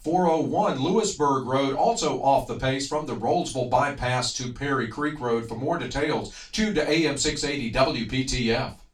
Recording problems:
off-mic speech; far
room echo; slight; dies away in 0.2 s

